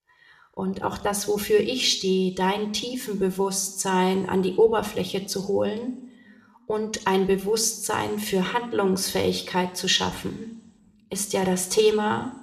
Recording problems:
room echo; very slight; dies away in 0.7 s

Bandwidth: 14 kHz